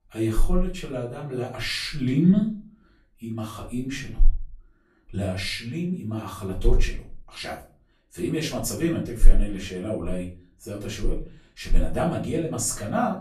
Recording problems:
off-mic speech; far
room echo; slight; dies away in 0.3 s

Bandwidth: 13.5 kHz